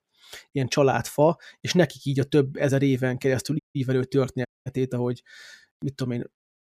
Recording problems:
audio cutting out; at 3.5 s and at 4.5 s

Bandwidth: 14.5 kHz